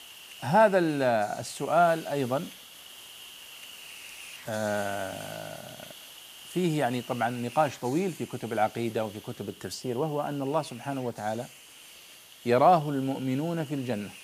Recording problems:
hiss; noticeable; throughout; 15 dB below the speech

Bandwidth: 15 kHz